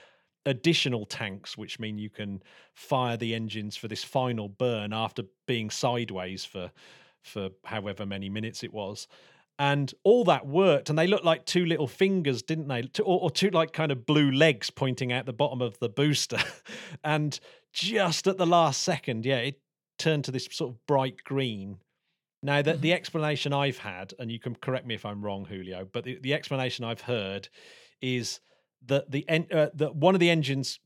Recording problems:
none

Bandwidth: 17 kHz